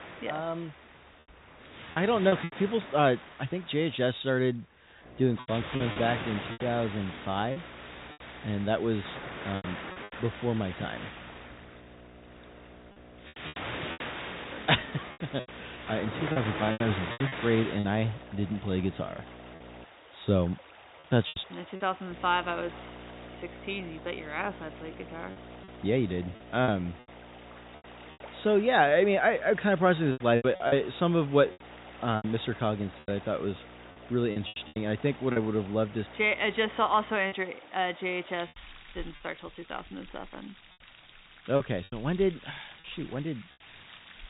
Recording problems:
high frequencies cut off; severe; nothing above 4 kHz
rain or running water; noticeable; throughout; 15 dB below the speech
electrical hum; faint; from 5 to 20 s and from 22 to 37 s; 60 Hz, 25 dB below the speech
choppy; very; 6% of the speech affected

